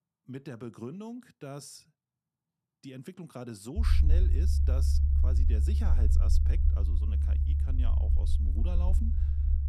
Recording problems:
low rumble; loud; from 4 s on; 1 dB below the speech

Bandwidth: 14.5 kHz